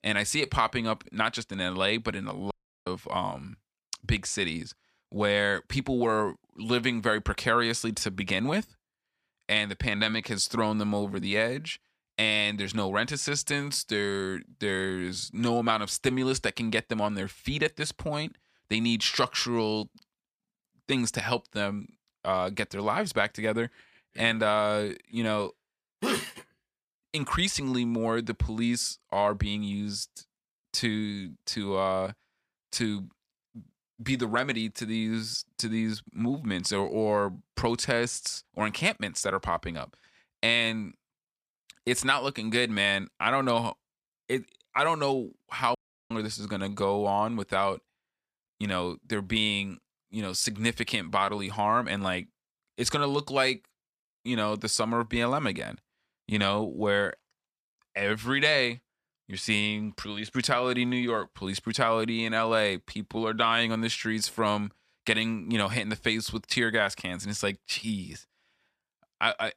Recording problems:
audio cutting out; at 2.5 s and at 46 s

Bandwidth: 14.5 kHz